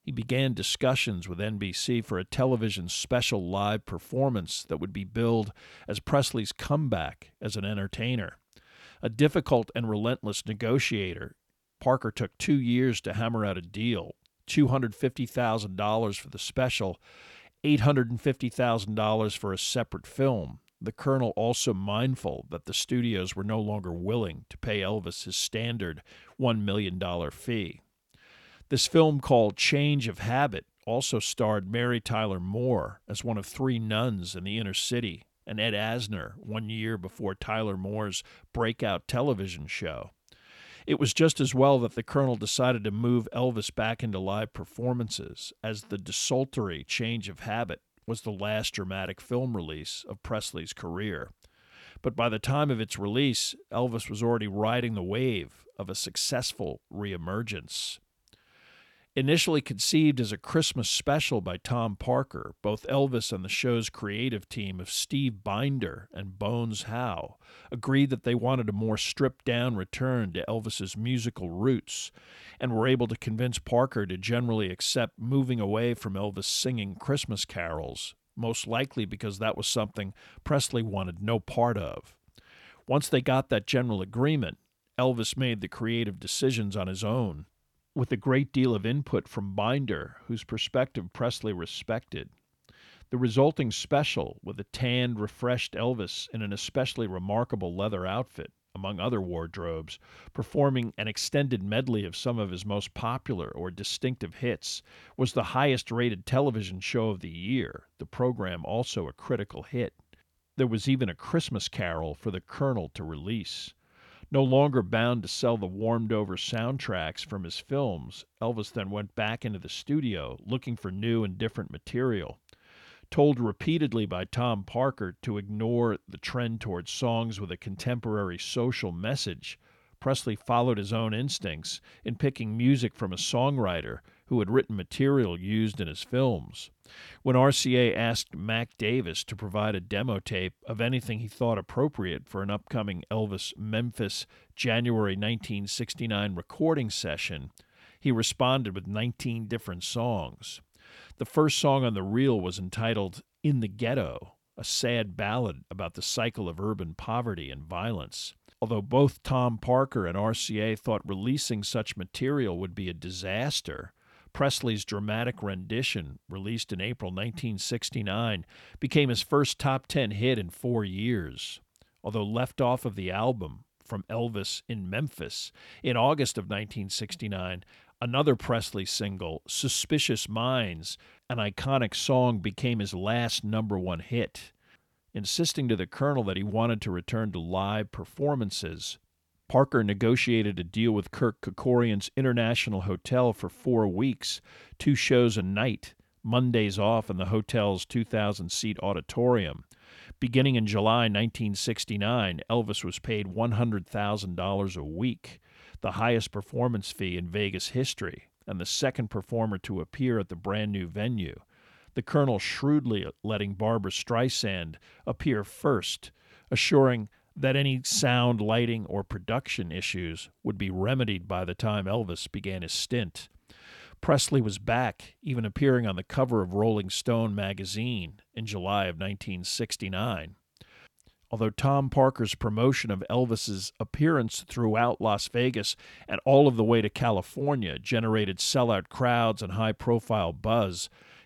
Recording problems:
none

